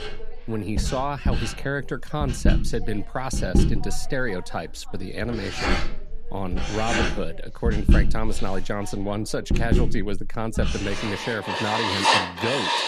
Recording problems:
household noises; very loud; throughout; 3 dB above the speech
voice in the background; noticeable; throughout; 20 dB below the speech

